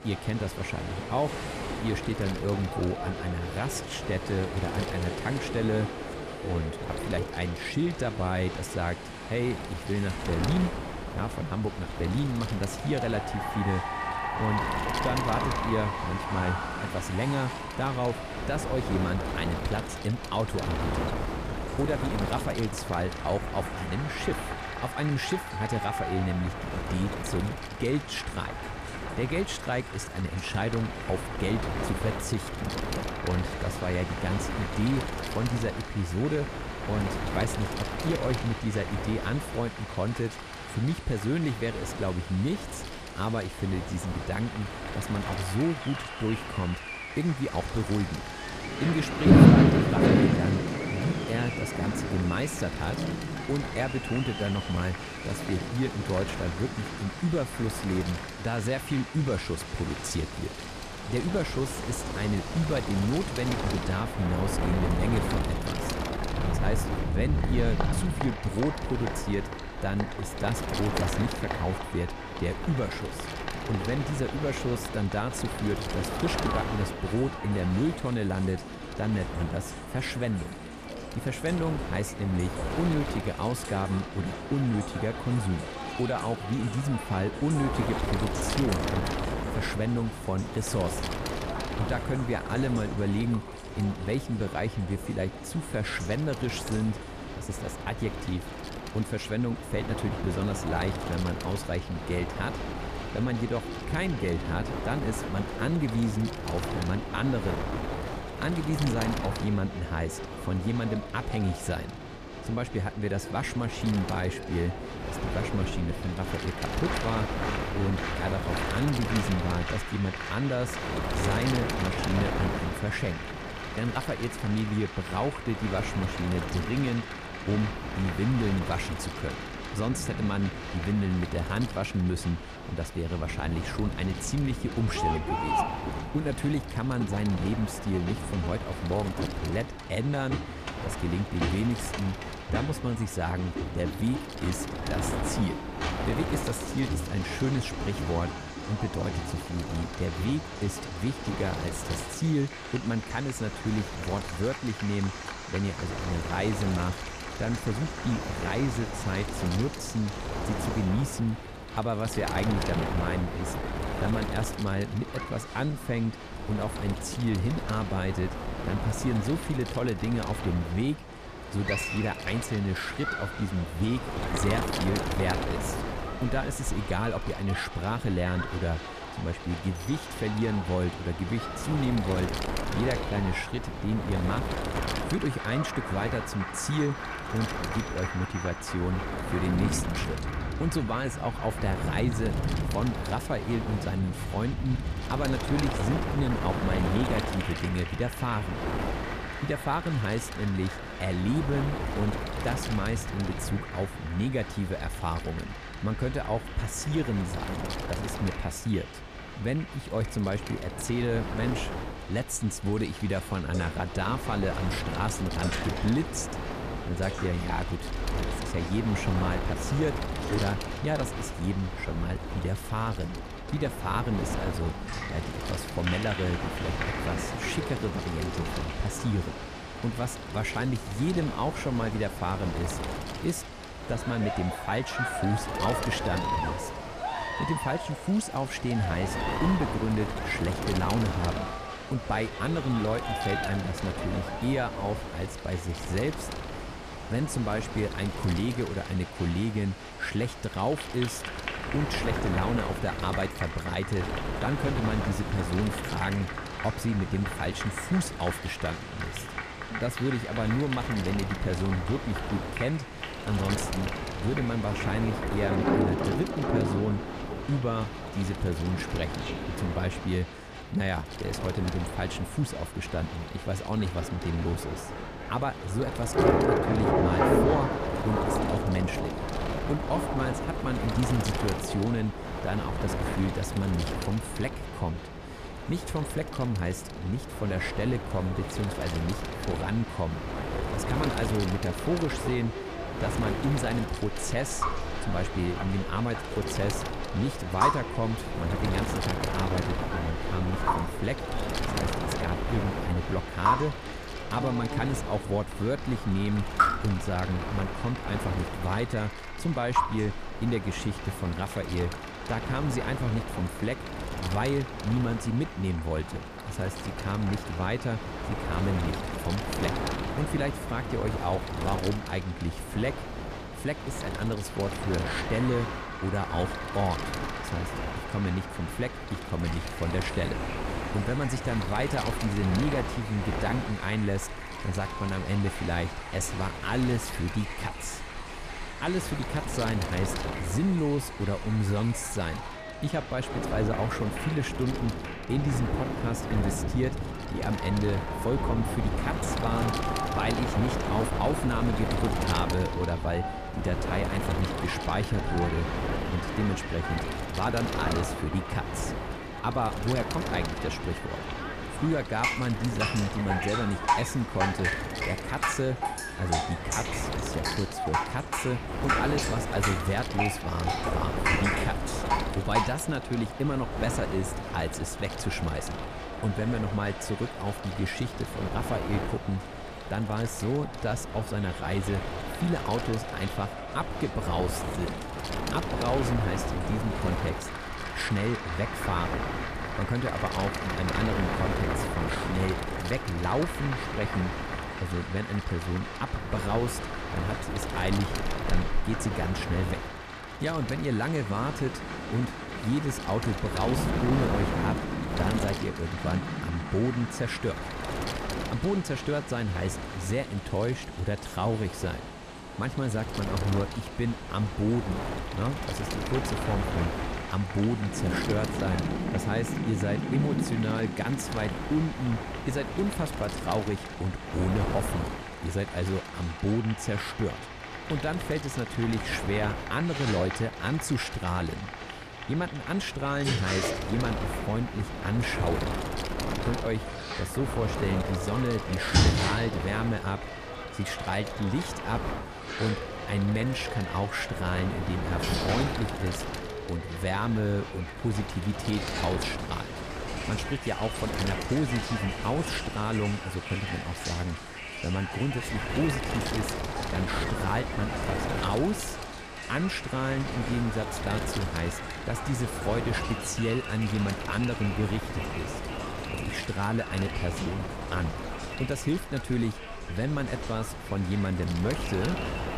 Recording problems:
wind noise on the microphone; heavy; 3 dB below the speech
crowd noise; loud; throughout; 8 dB below the speech
rain or running water; loud; throughout; 5 dB below the speech

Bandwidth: 14.5 kHz